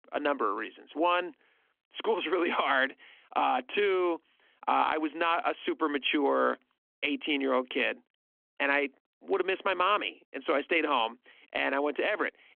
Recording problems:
phone-call audio; nothing above 3.5 kHz

